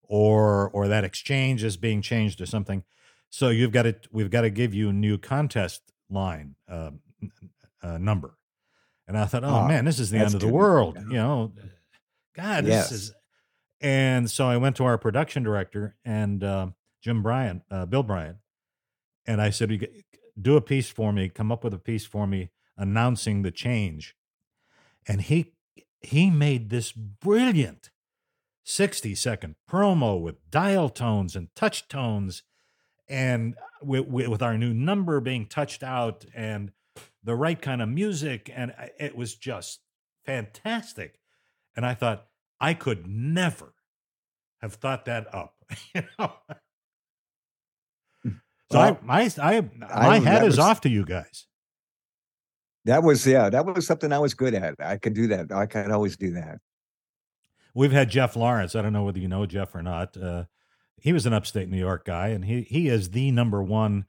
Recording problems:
none

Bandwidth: 18 kHz